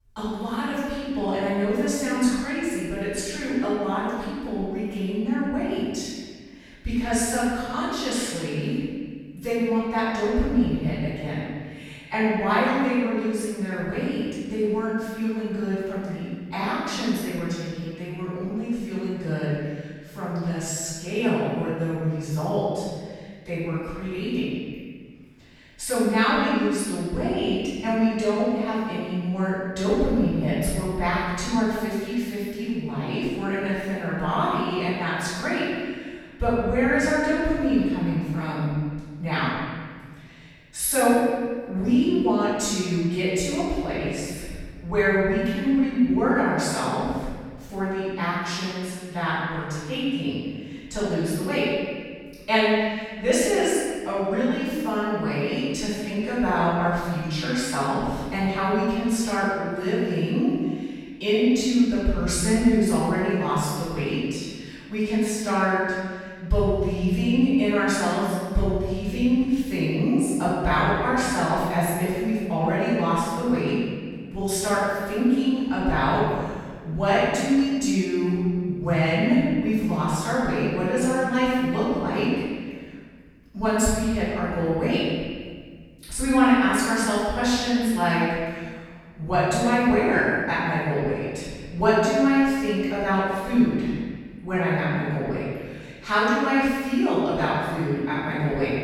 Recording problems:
room echo; strong; dies away in 1.6 s
off-mic speech; far

